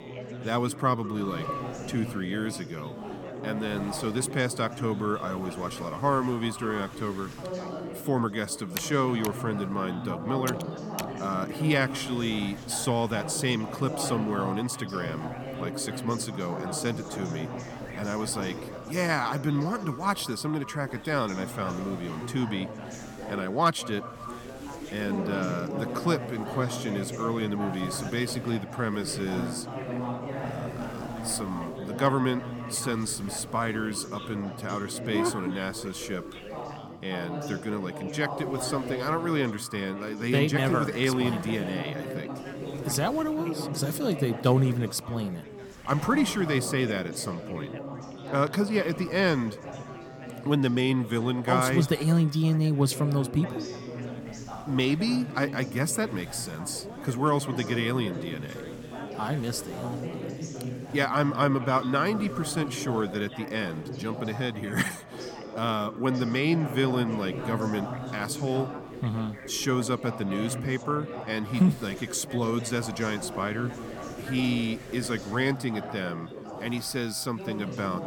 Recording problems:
echo of what is said; faint; throughout; 190 ms later, 20 dB below the speech
background chatter; loud; throughout; 4 voices, 9 dB below the speech
wind noise on the microphone; occasional gusts; 25 dB below the speech
keyboard typing; noticeable; from 7.5 to 11 s; peak 8 dB below the speech

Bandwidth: 18 kHz